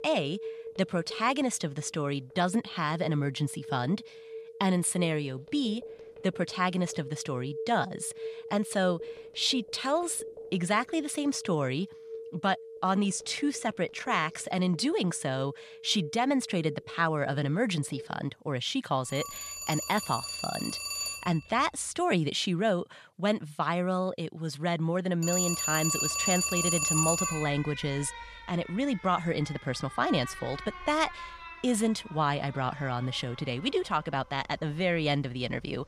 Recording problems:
alarms or sirens; loud; throughout; 6 dB below the speech

